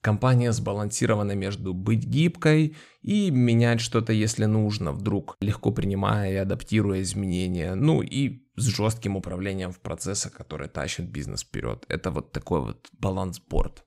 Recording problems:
none

